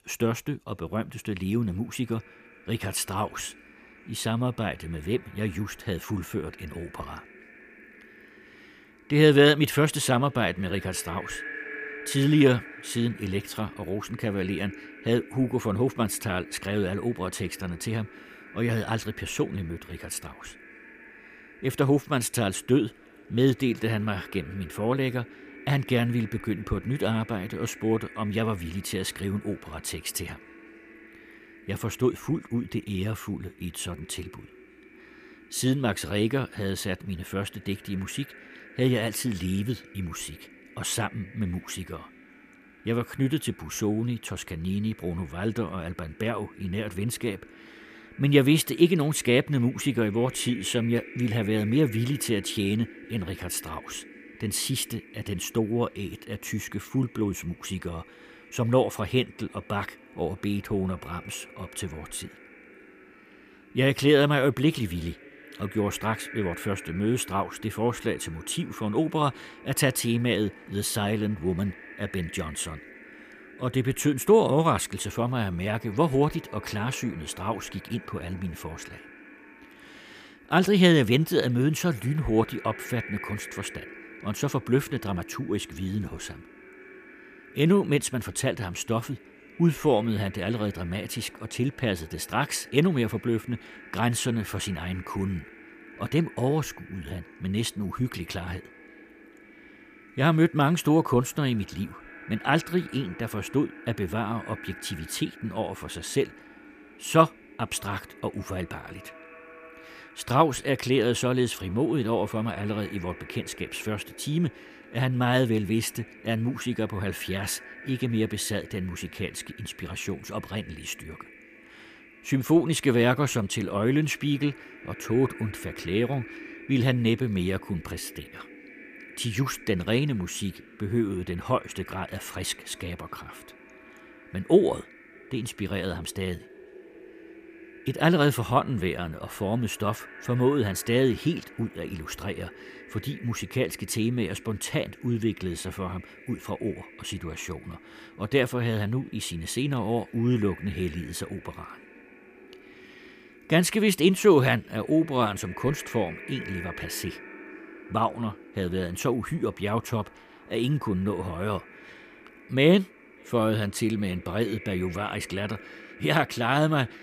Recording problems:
echo of what is said; faint; throughout; 590 ms later, 20 dB below the speech

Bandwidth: 15 kHz